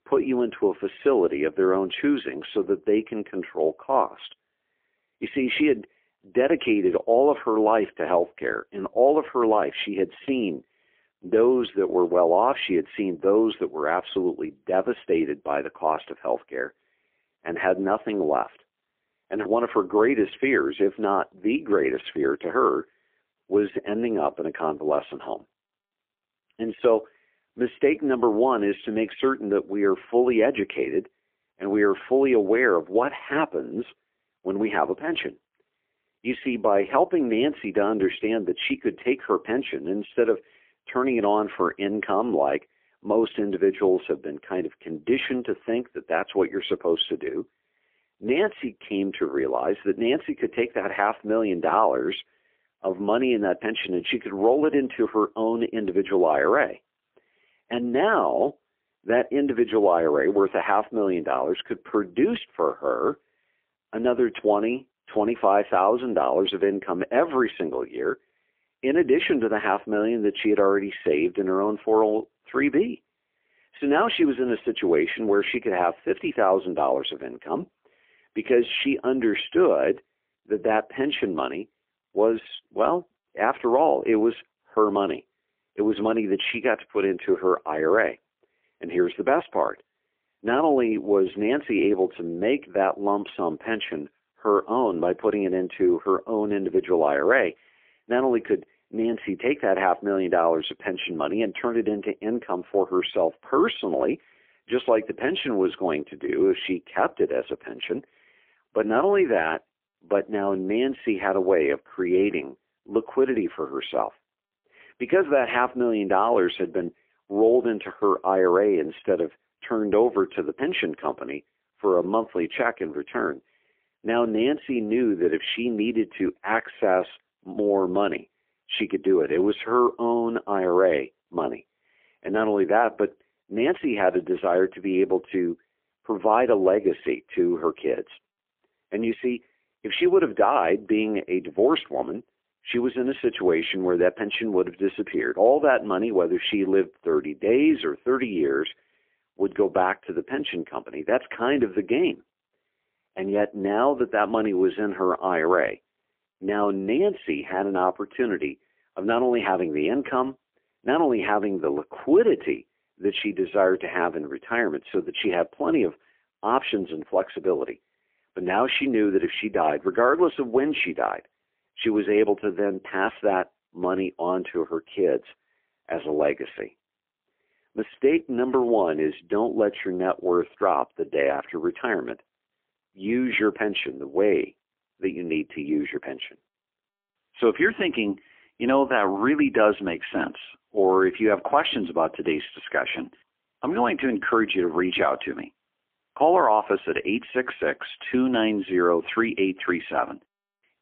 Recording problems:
phone-call audio; poor line; nothing above 3.5 kHz

